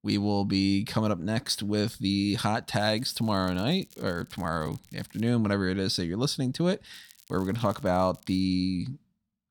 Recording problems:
crackling; faint; from 3 to 5.5 s and from 7 to 8.5 s; 25 dB below the speech

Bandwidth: 18 kHz